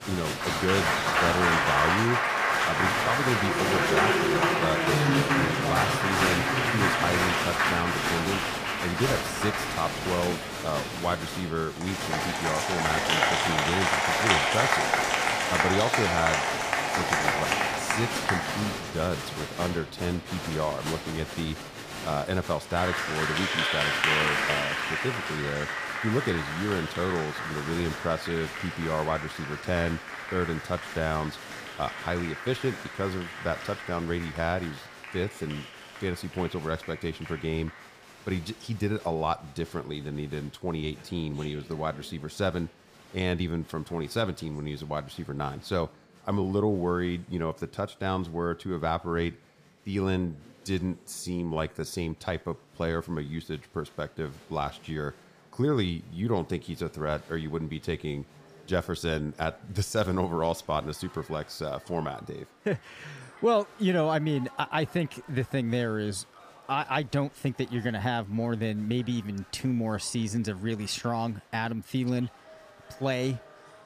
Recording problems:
crowd noise; very loud; throughout; 4 dB above the speech

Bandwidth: 15 kHz